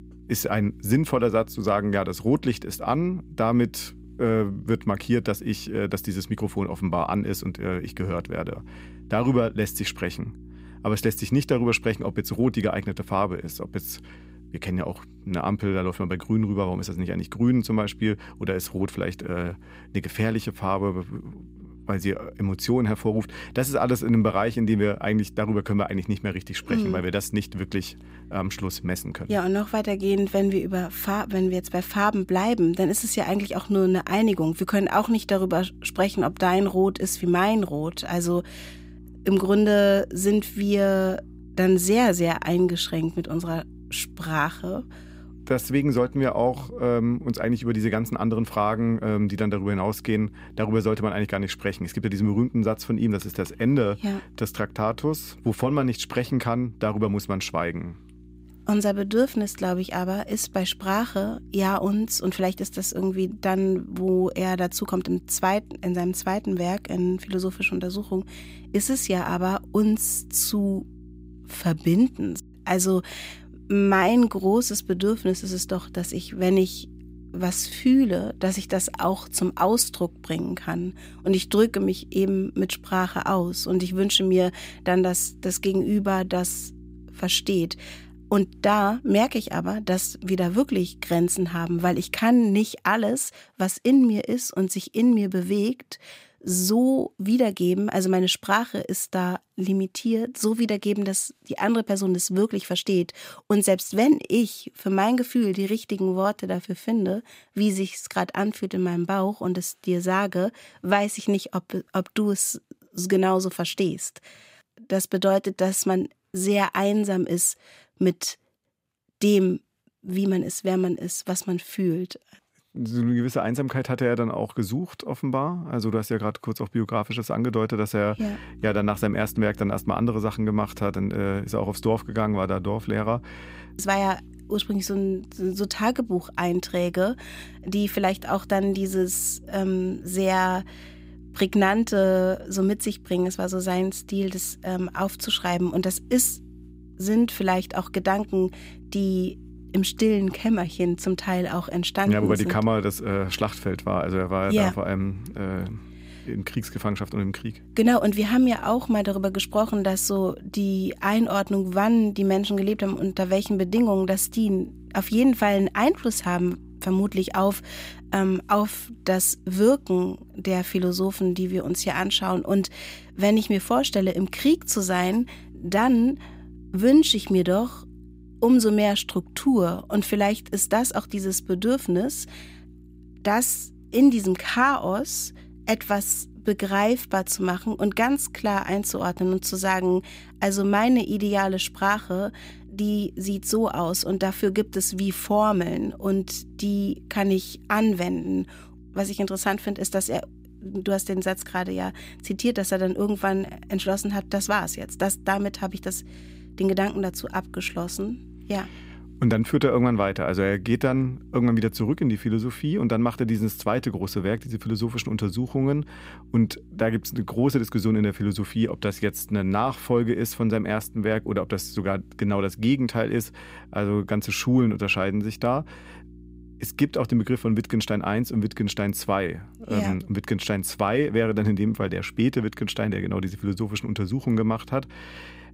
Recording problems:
electrical hum; faint; until 1:32 and from 2:08 on; 60 Hz, 30 dB below the speech

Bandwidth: 15.5 kHz